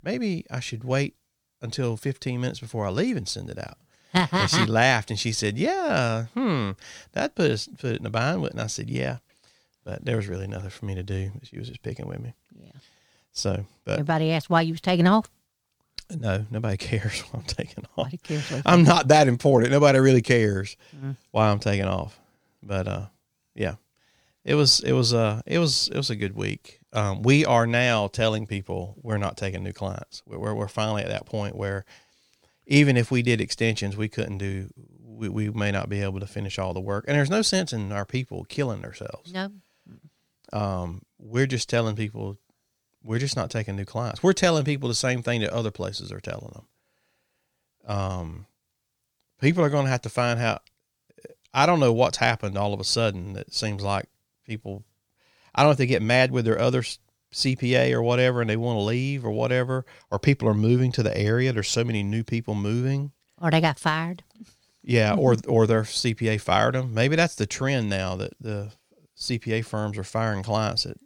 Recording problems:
none

